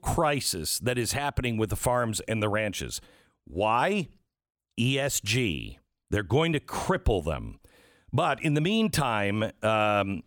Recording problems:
none

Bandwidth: 18 kHz